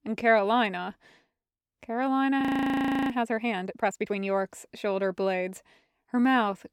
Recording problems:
audio freezing; at 2.5 s for 0.5 s

